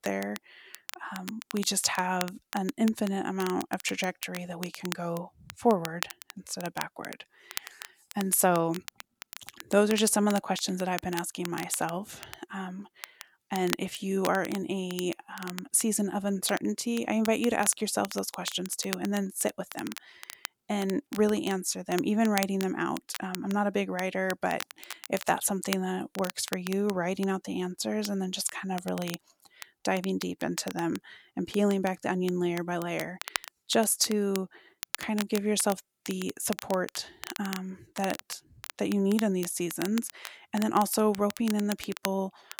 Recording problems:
crackle, like an old record; noticeable; 10 dB below the speech

